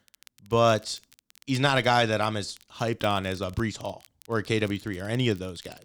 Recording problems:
crackle, like an old record; faint; 25 dB below the speech

